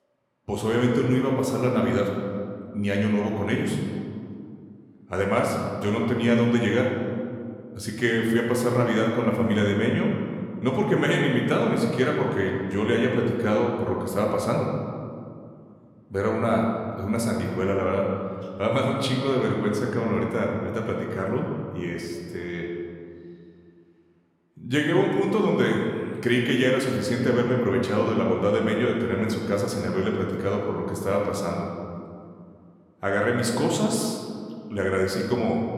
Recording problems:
room echo; noticeable; dies away in 2 s
off-mic speech; somewhat distant

